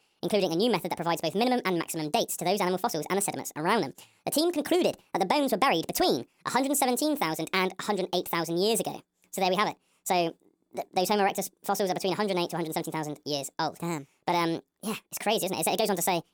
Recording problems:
wrong speed and pitch; too fast and too high; 1.5 times normal speed

